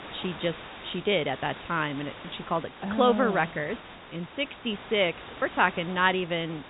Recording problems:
high frequencies cut off; severe; nothing above 4 kHz
hiss; noticeable; throughout; 15 dB below the speech

